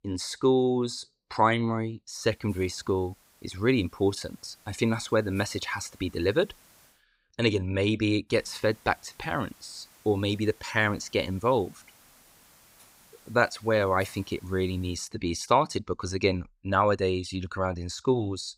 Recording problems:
hiss; faint; from 2 to 7 s and from 8.5 to 15 s; 25 dB below the speech

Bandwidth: 15.5 kHz